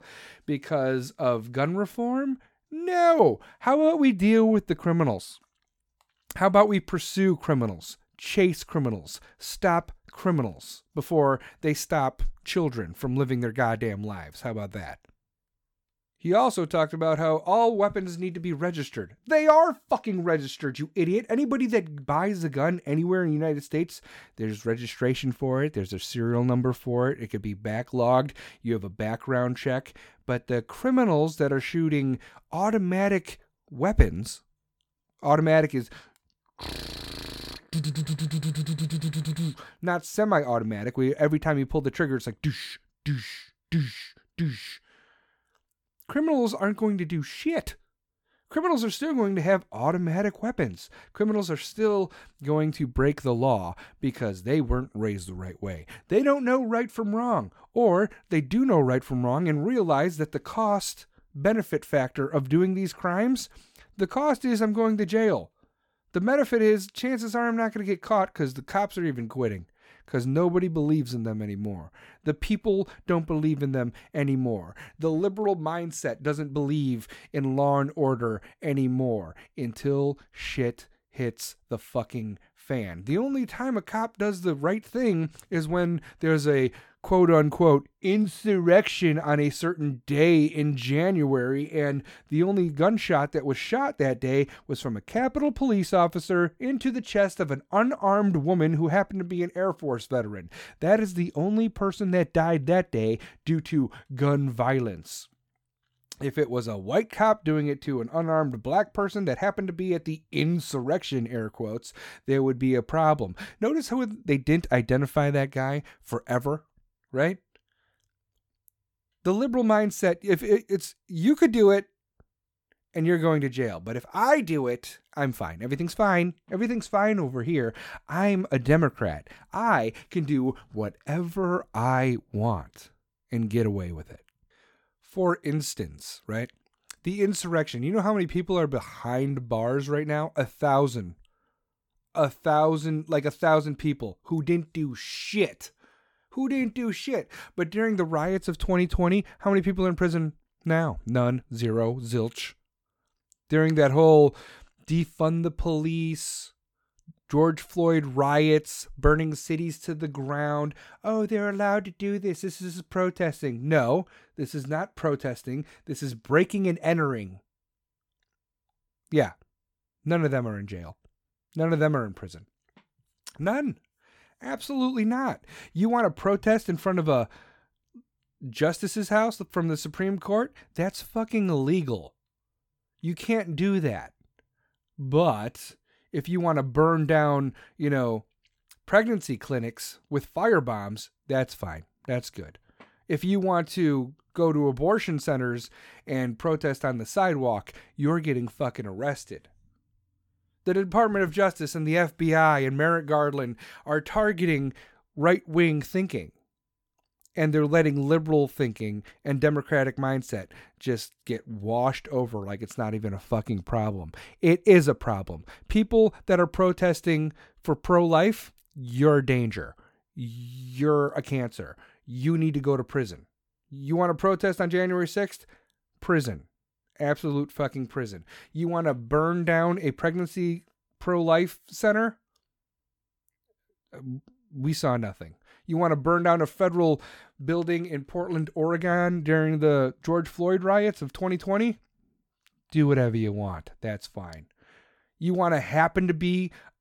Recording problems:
none

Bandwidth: 18 kHz